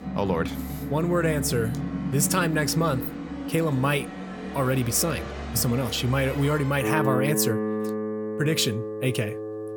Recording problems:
background music; loud; throughout; 6 dB below the speech

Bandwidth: 18 kHz